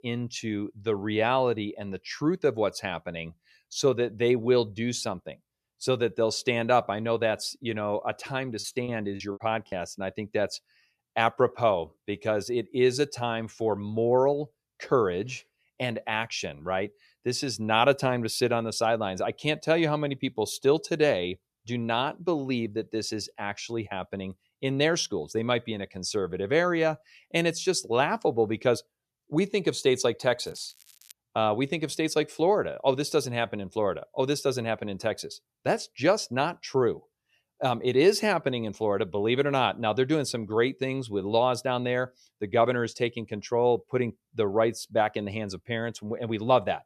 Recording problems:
crackling; faint; at 30 s; 25 dB below the speech
choppy; very; from 8.5 to 9.5 s; 13% of the speech affected

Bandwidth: 14 kHz